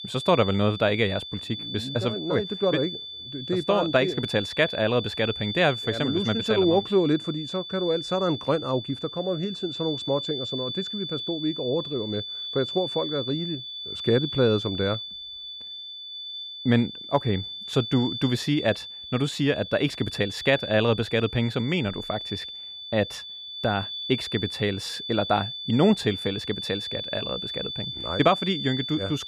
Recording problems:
high-pitched whine; loud; throughout; 3.5 kHz, 7 dB below the speech

